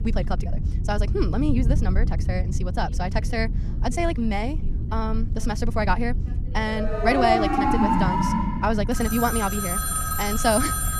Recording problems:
wrong speed, natural pitch; too fast; 1.6 times normal speed
alarms or sirens; very loud; from 7 s on; 2 dB above the speech
low rumble; noticeable; throughout; 15 dB below the speech
voice in the background; faint; throughout; 25 dB below the speech

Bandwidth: 14.5 kHz